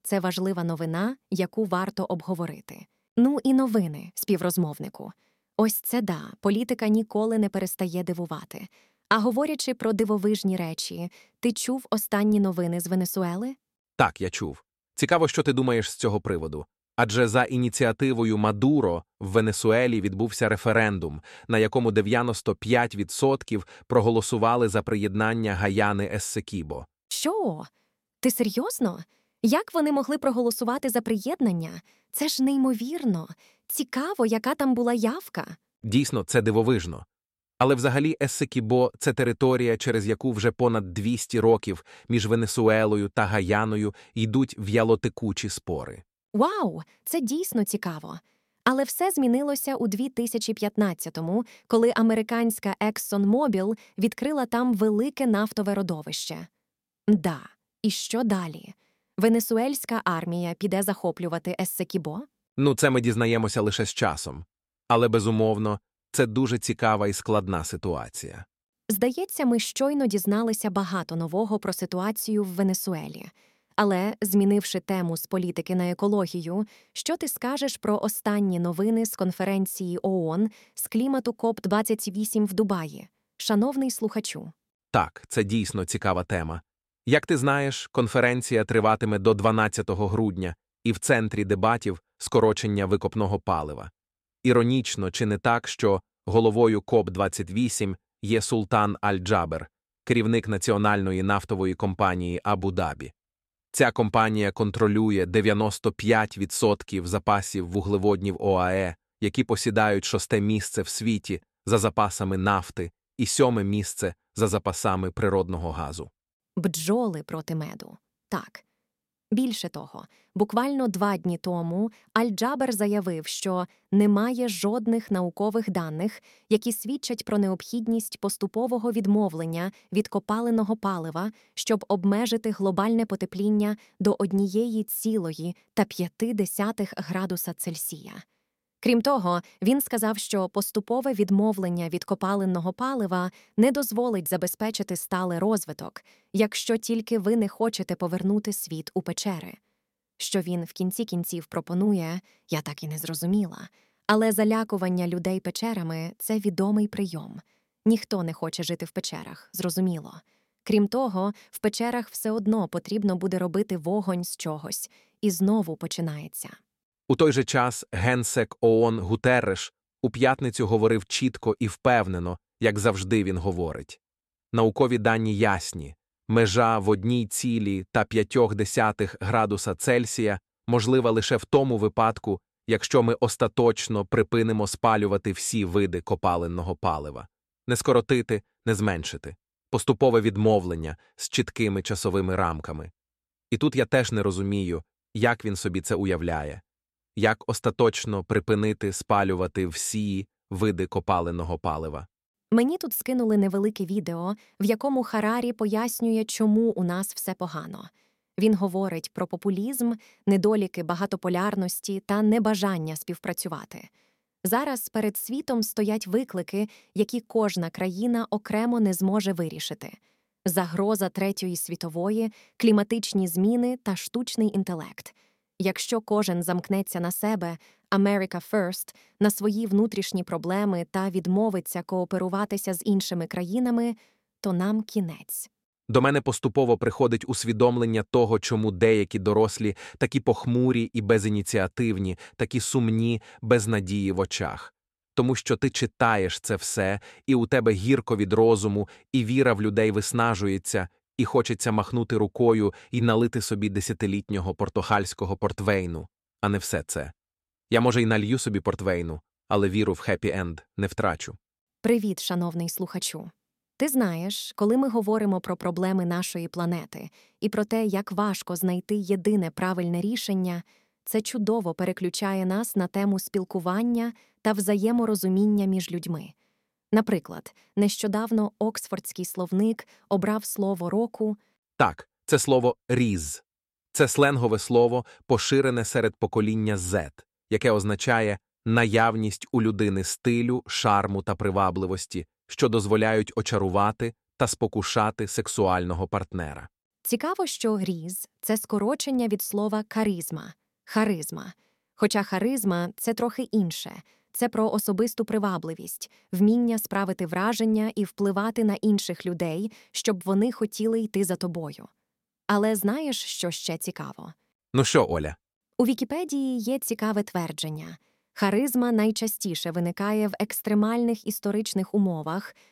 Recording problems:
none

